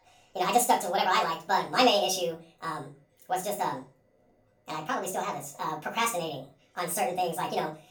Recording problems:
off-mic speech; far
wrong speed and pitch; too fast and too high; 1.7 times normal speed
room echo; very slight; dies away in 0.3 s

